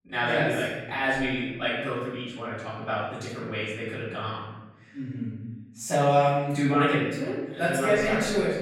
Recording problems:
off-mic speech; far
room echo; noticeable; dies away in 1.1 s

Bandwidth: 16.5 kHz